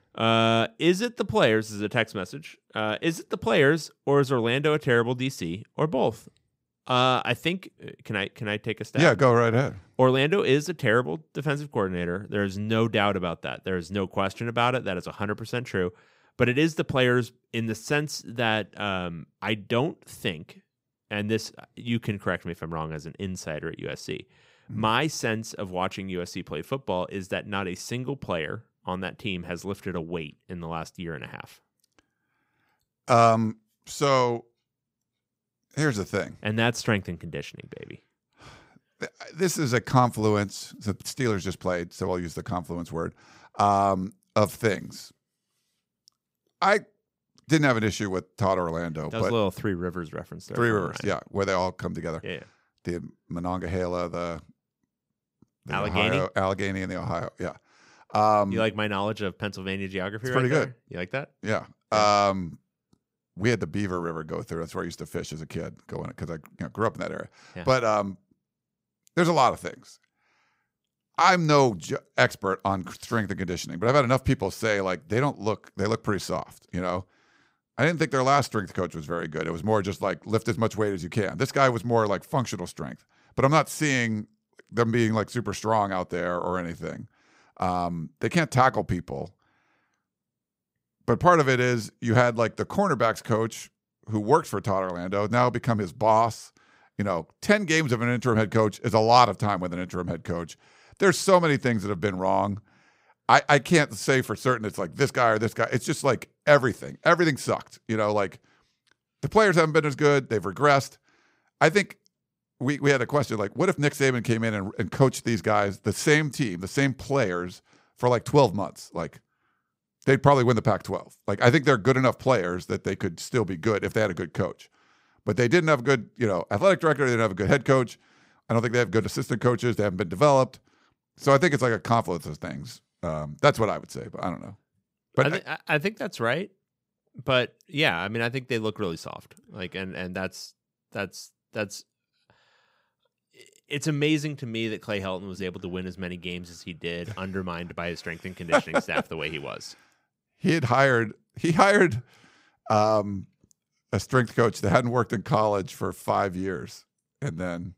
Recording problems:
none

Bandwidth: 15.5 kHz